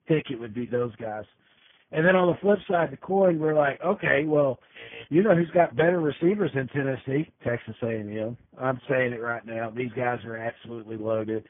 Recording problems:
garbled, watery; badly
high frequencies cut off; severe; nothing above 3.5 kHz
alarm; faint; at 5 s; peak 15 dB below the speech

